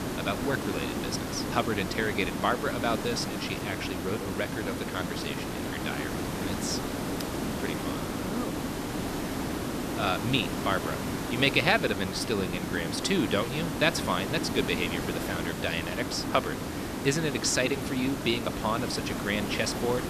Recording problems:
hiss; loud; throughout; 3 dB below the speech

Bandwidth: 14.5 kHz